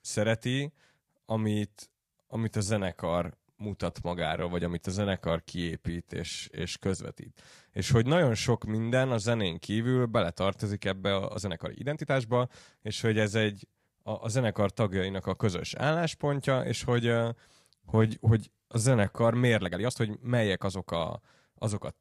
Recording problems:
uneven, jittery; strongly; from 2 to 21 s

